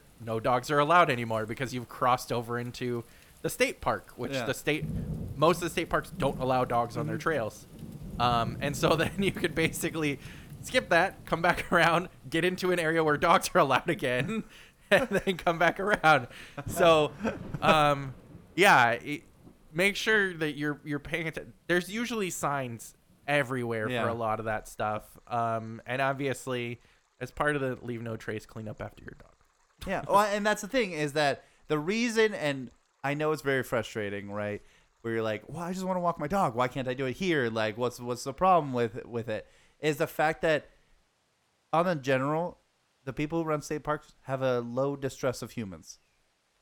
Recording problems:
rain or running water; noticeable; throughout; 15 dB below the speech

